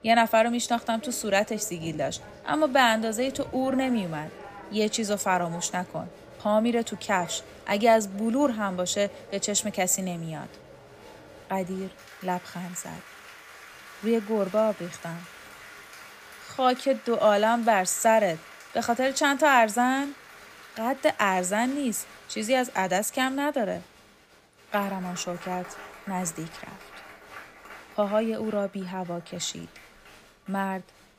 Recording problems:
crowd noise; noticeable; throughout; 20 dB below the speech

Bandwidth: 15 kHz